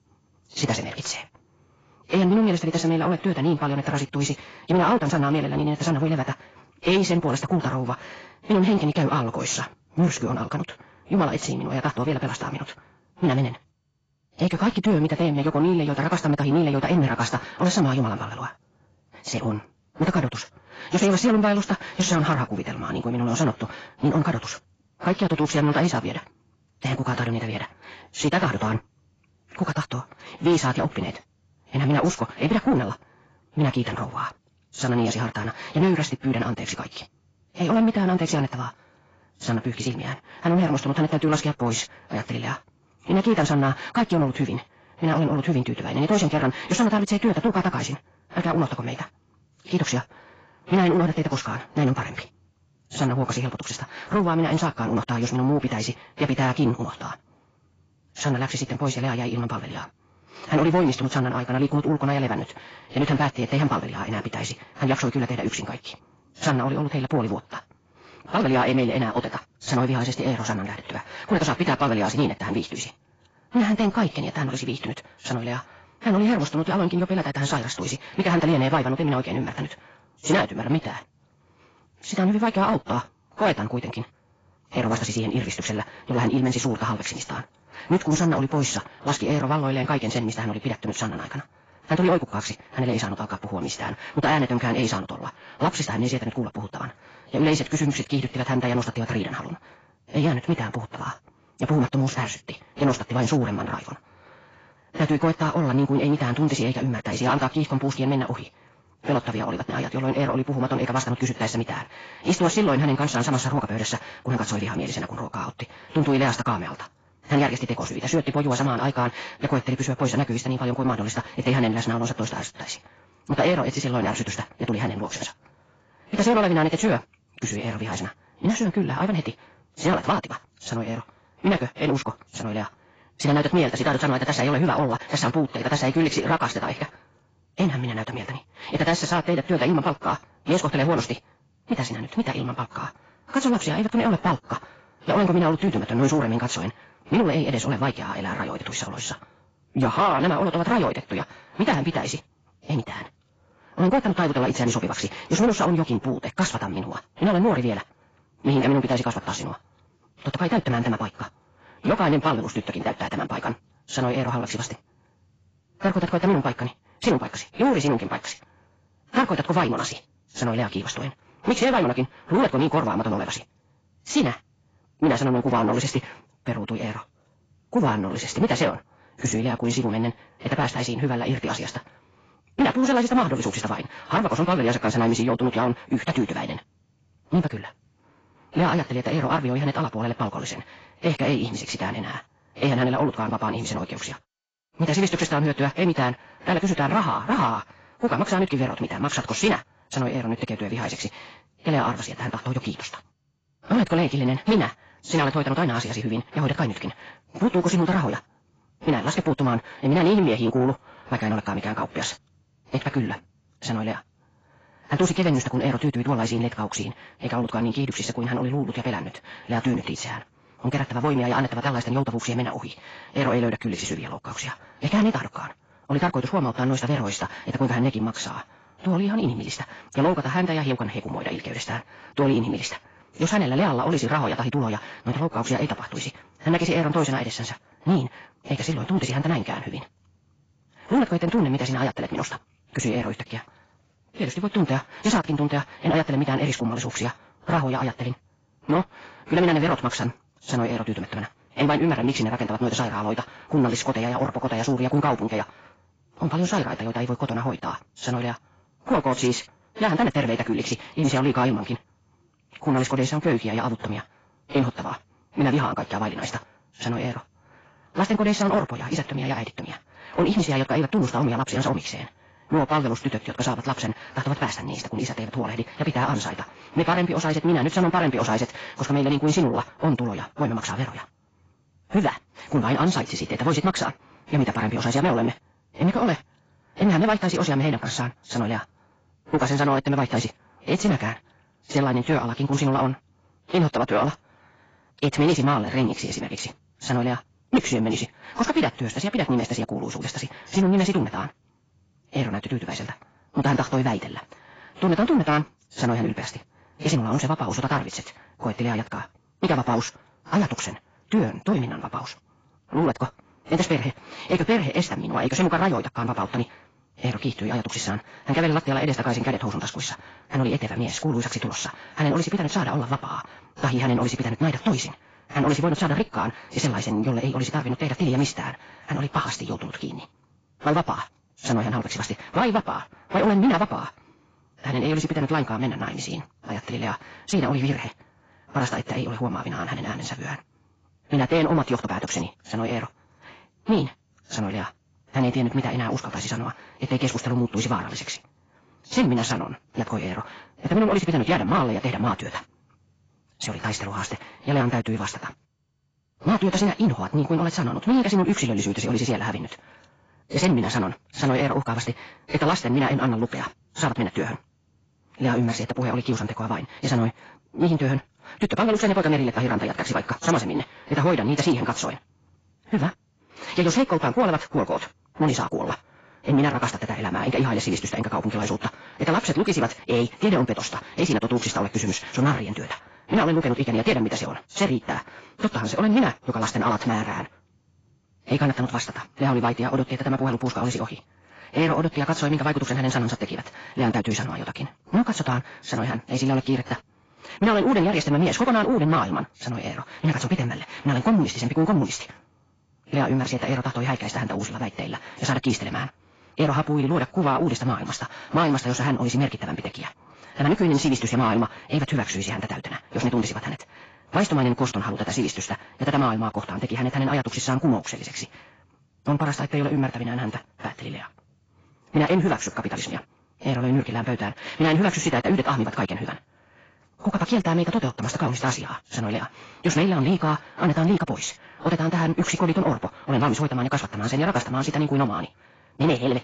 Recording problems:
garbled, watery; badly; nothing above 7.5 kHz
wrong speed, natural pitch; too fast; 1.8 times normal speed
distortion; slight; 10 dB below the speech

